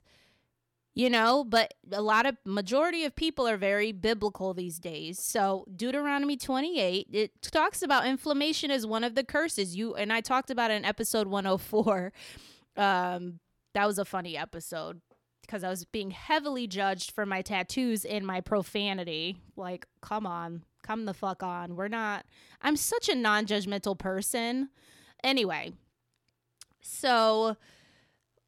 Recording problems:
none

